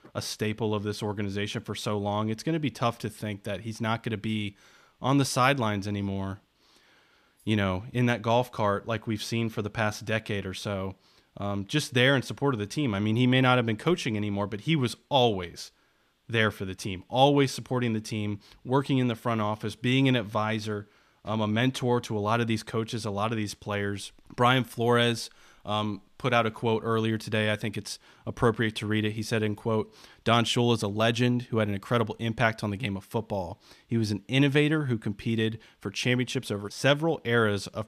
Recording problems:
none

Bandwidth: 14.5 kHz